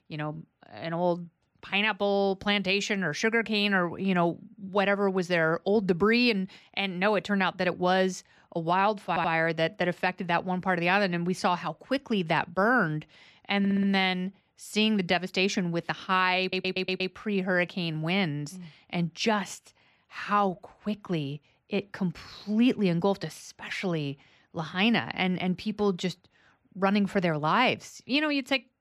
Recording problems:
audio stuttering; at 9 s, at 14 s and at 16 s

